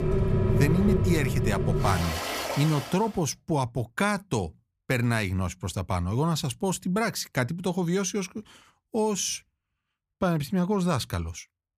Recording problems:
rain or running water; very loud; until 2.5 s; as loud as the speech

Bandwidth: 15 kHz